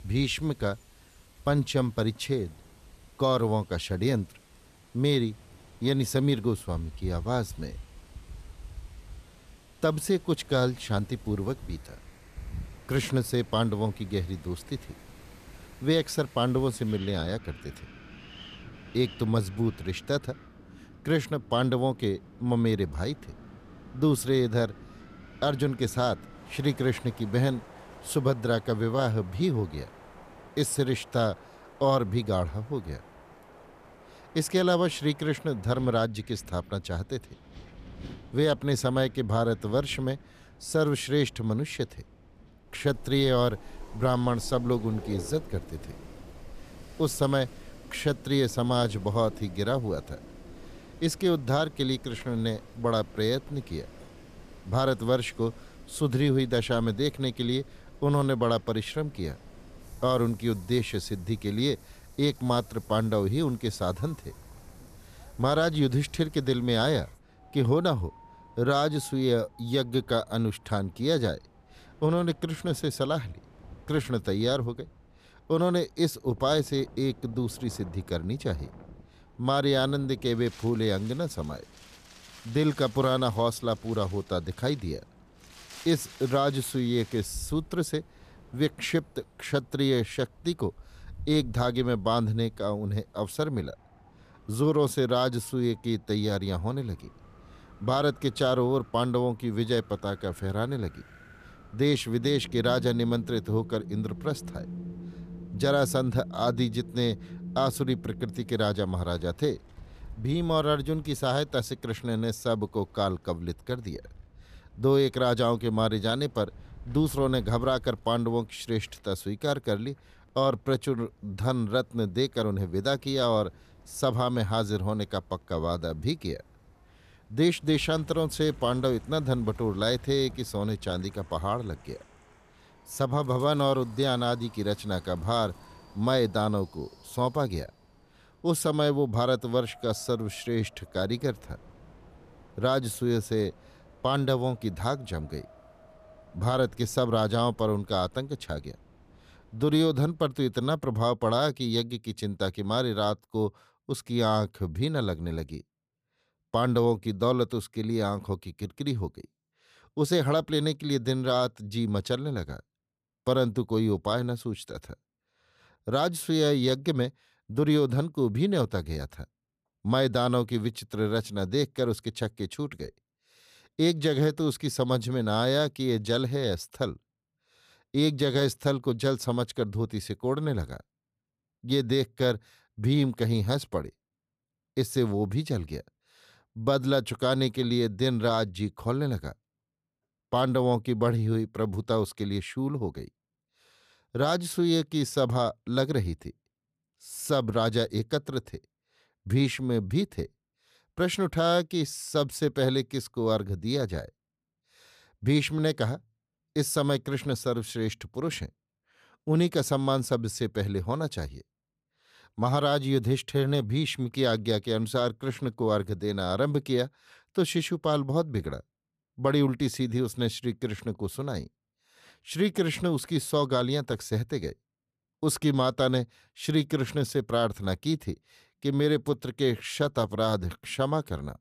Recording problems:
wind in the background; faint; until 2:31; 20 dB below the speech

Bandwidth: 14.5 kHz